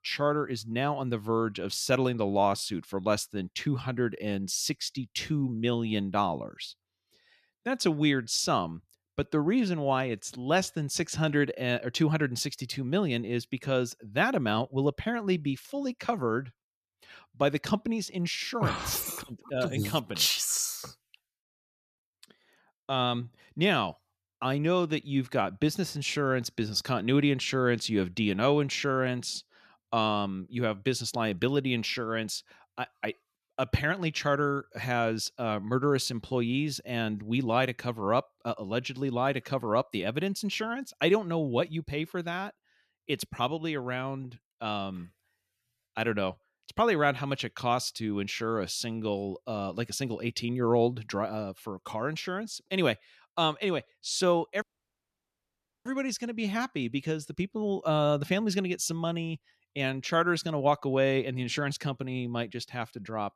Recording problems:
audio cutting out; at 55 s for 1 s

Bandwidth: 14.5 kHz